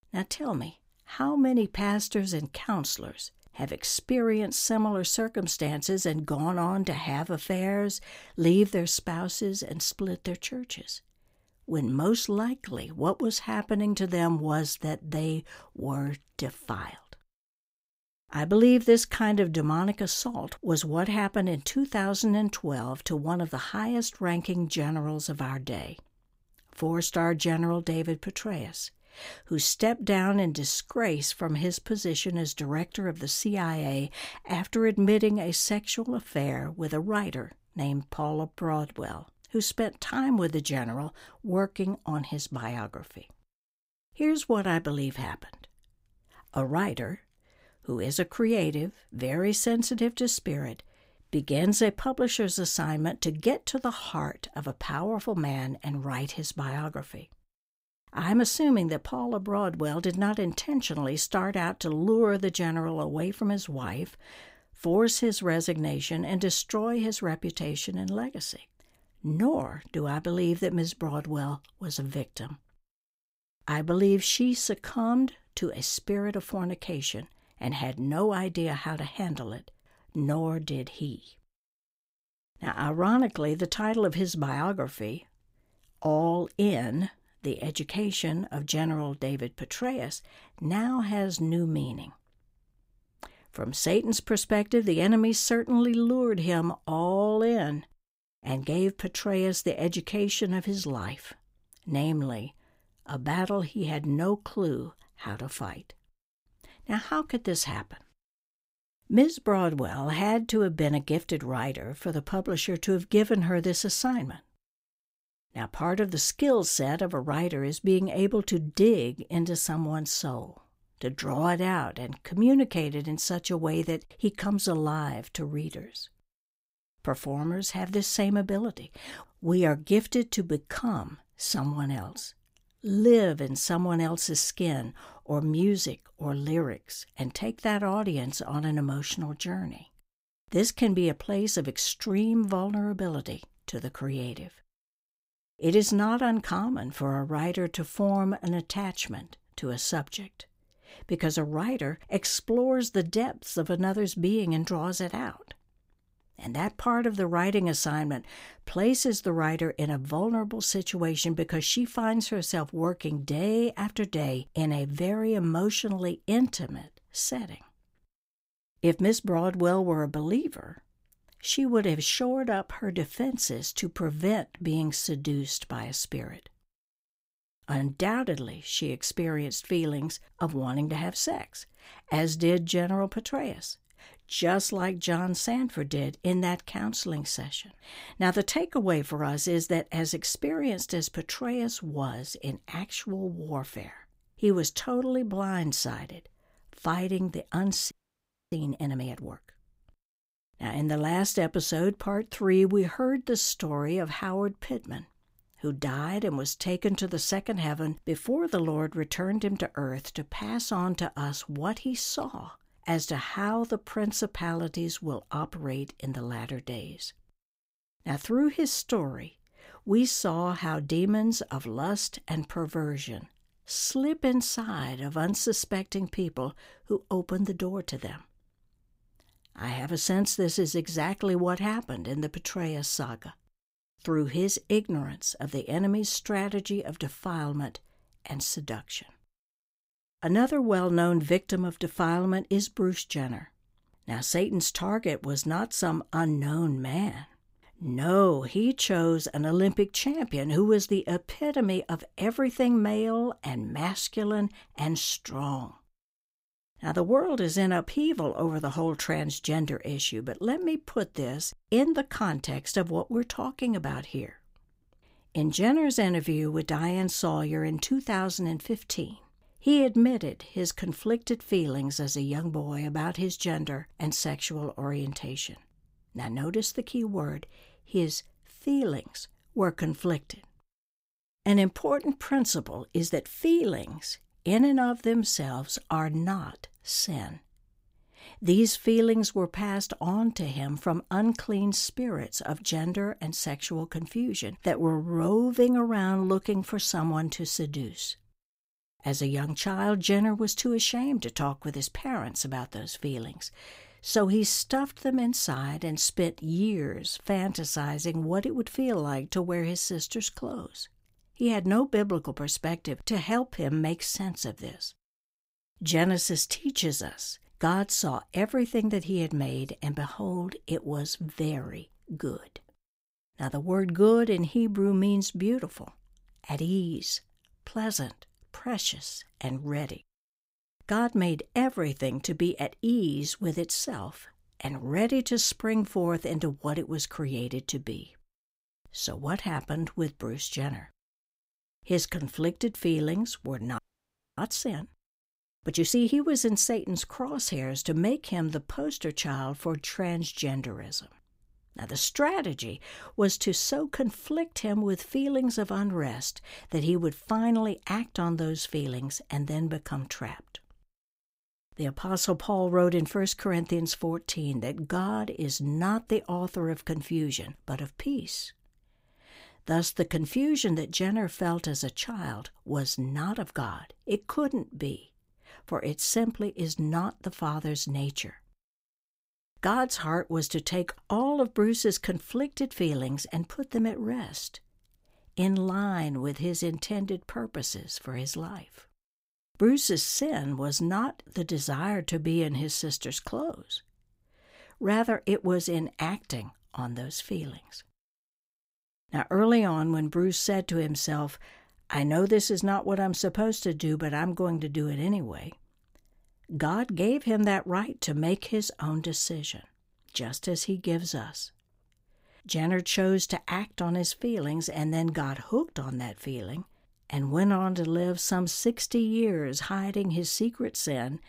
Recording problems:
audio freezing; at 3:18 for 0.5 s and at 5:44 for 0.5 s

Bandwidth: 15.5 kHz